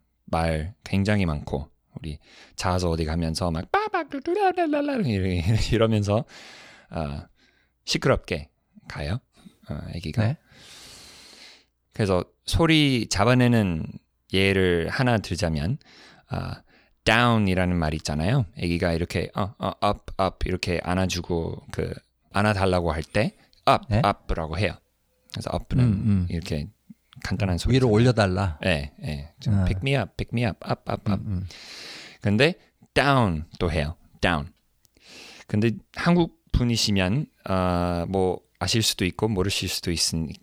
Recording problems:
none

